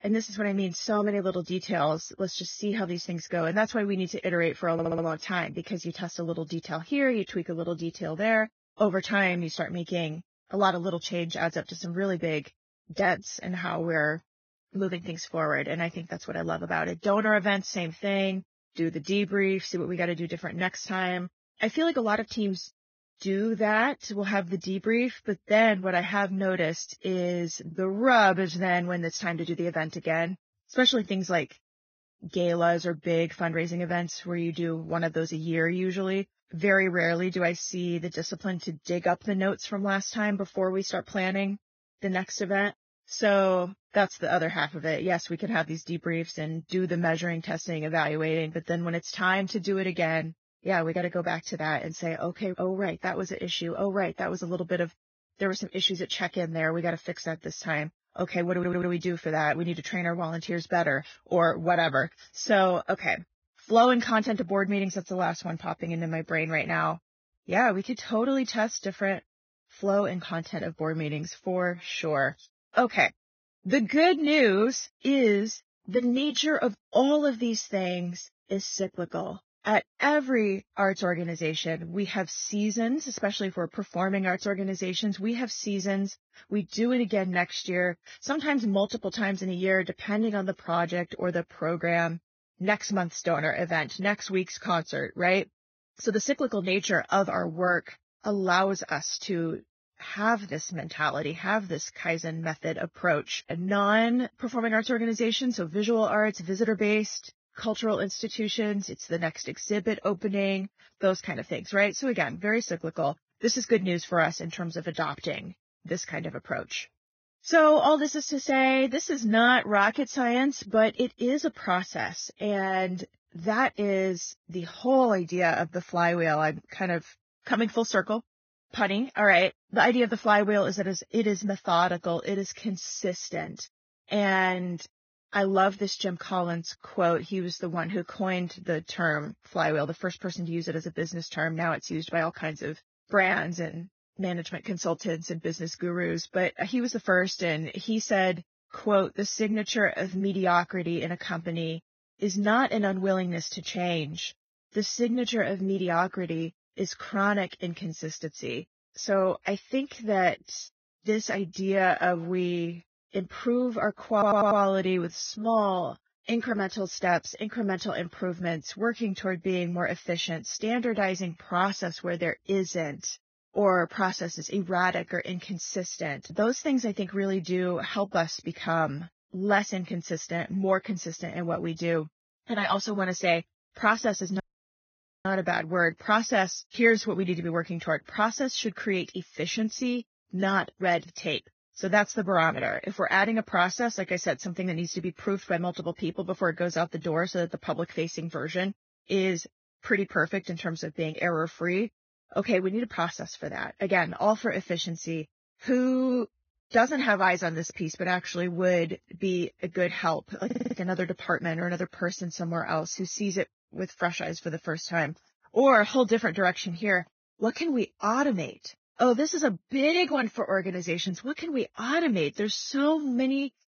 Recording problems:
garbled, watery; badly; nothing above 6.5 kHz
audio stuttering; 4 times, first at 4.5 s
audio cutting out; at 3:04 for 1 s

